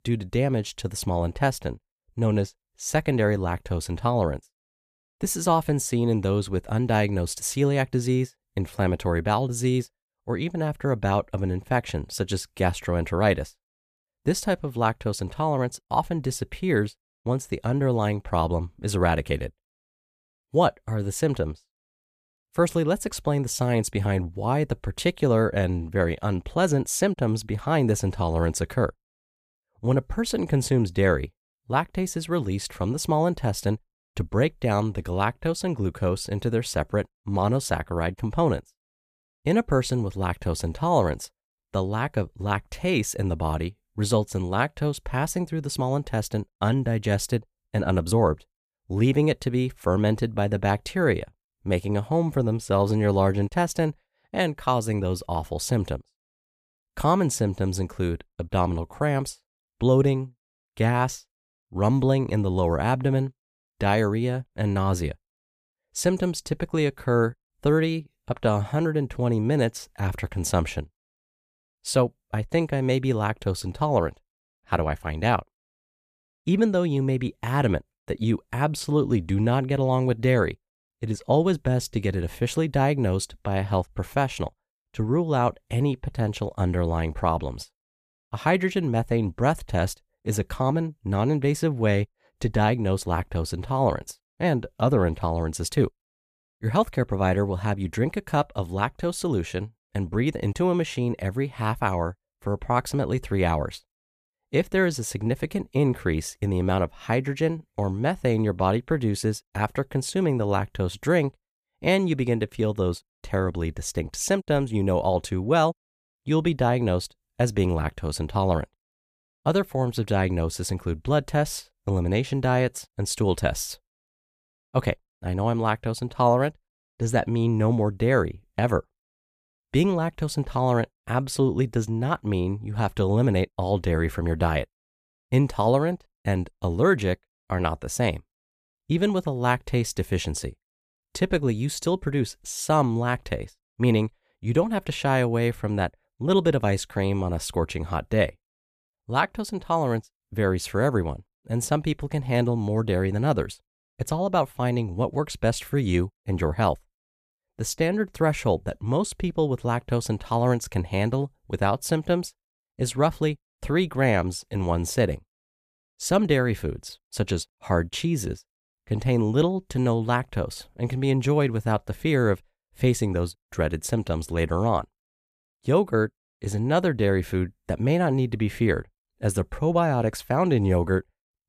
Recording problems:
none

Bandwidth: 14.5 kHz